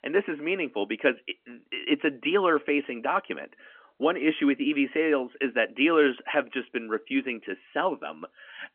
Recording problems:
phone-call audio; nothing above 3 kHz

